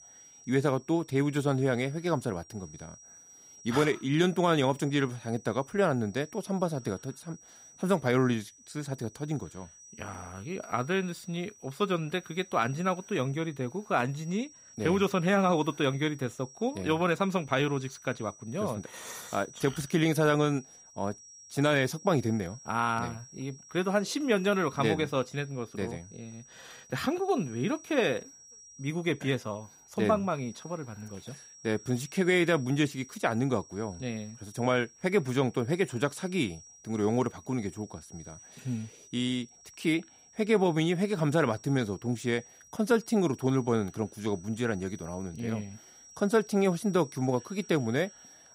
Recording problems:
high-pitched whine; faint; throughout; 5.5 kHz, 20 dB below the speech

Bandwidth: 15.5 kHz